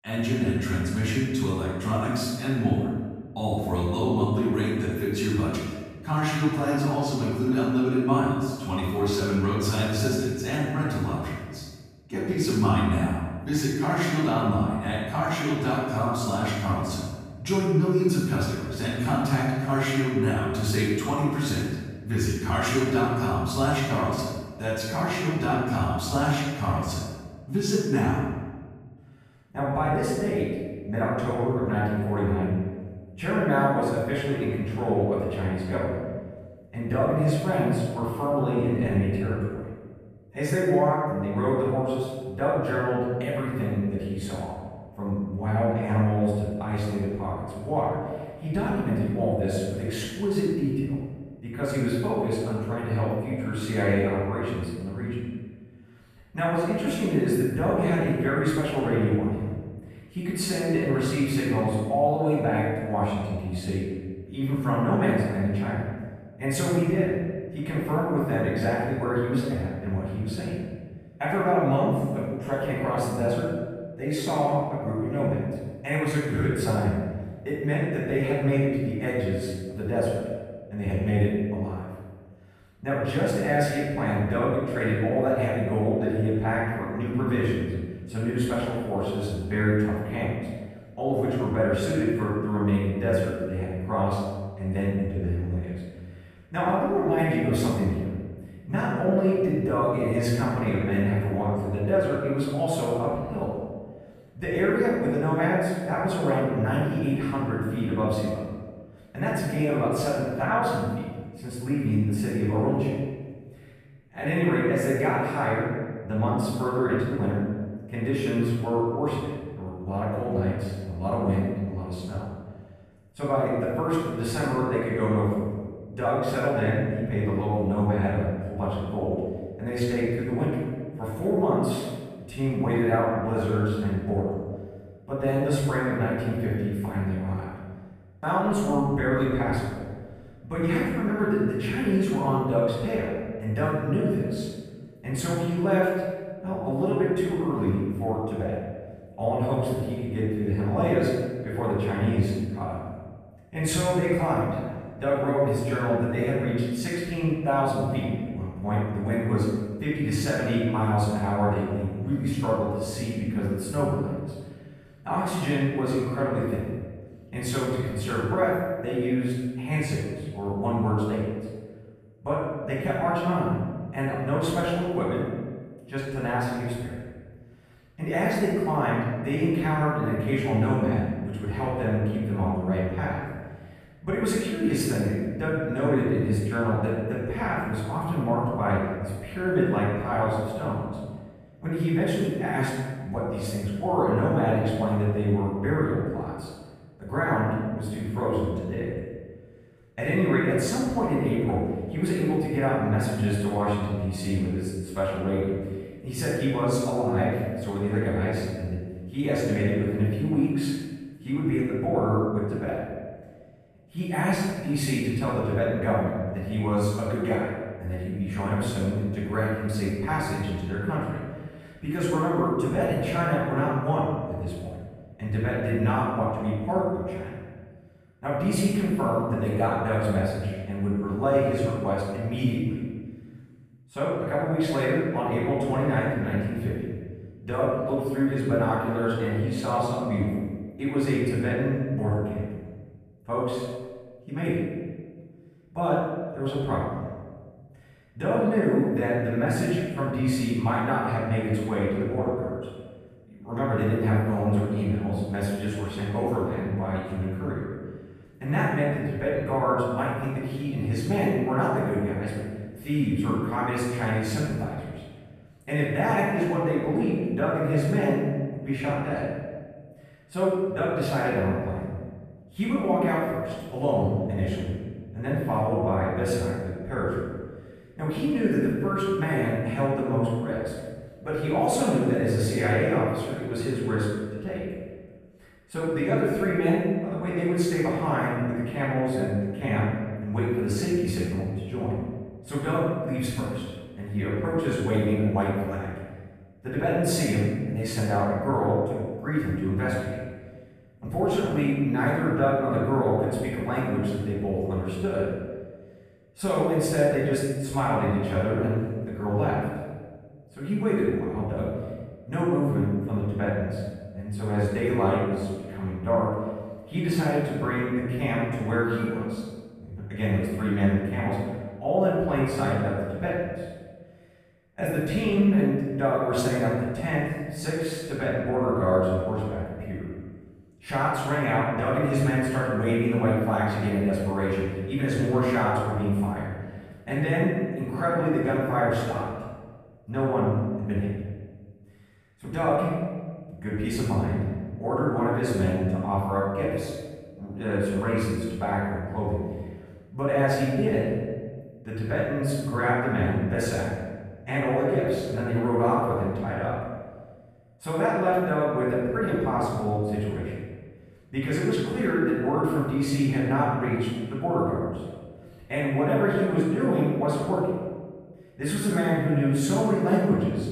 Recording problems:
room echo; strong; dies away in 1.3 s
off-mic speech; far

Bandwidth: 14.5 kHz